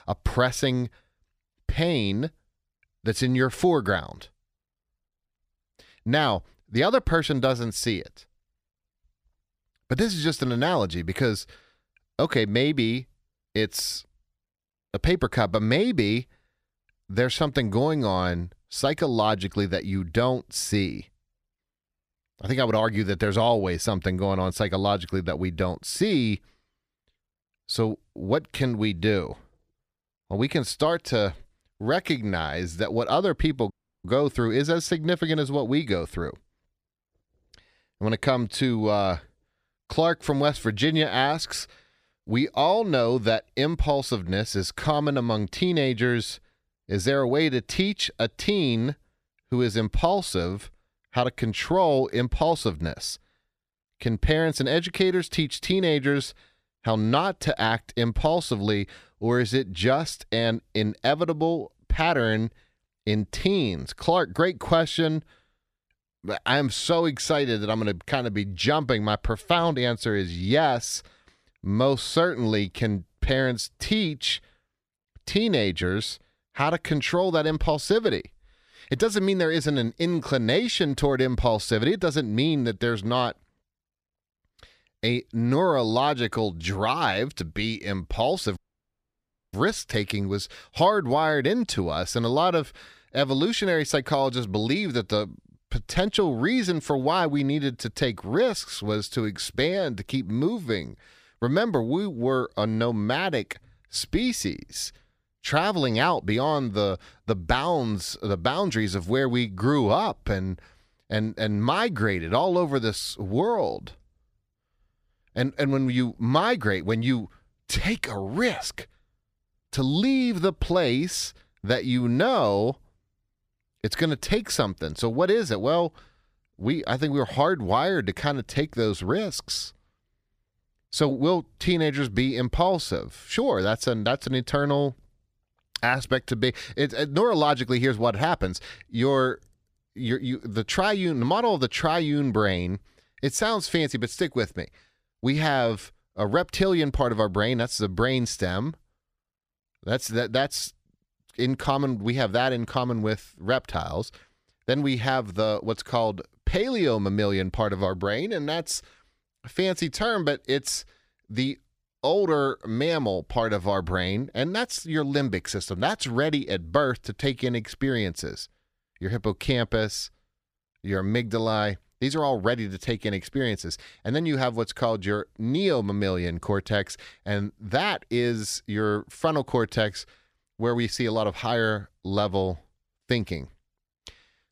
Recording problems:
audio cutting out; at 34 s and at 1:29 for 1 s

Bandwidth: 15 kHz